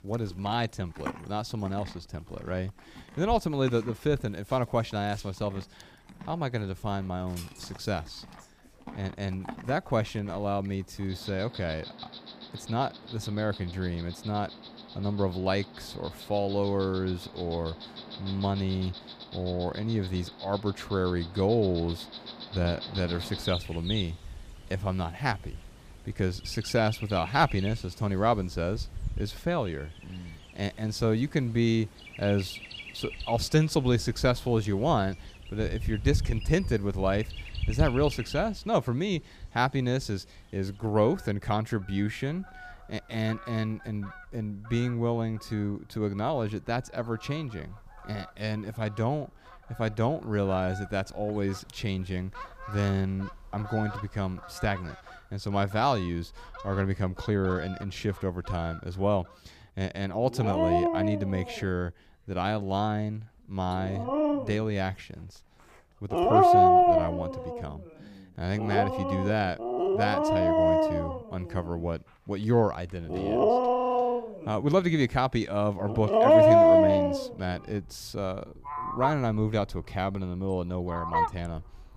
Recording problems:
animal sounds; very loud; throughout; 3 dB above the speech

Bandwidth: 15 kHz